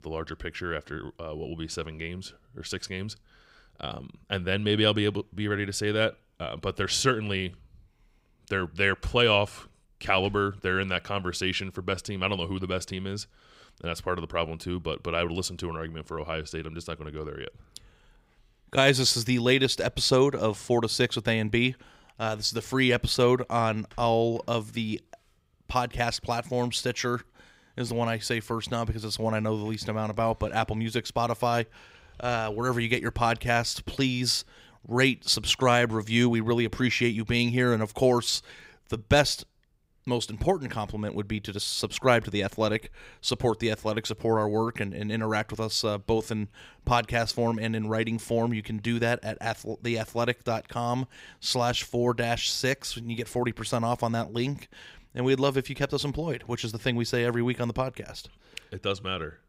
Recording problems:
none

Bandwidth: 15.5 kHz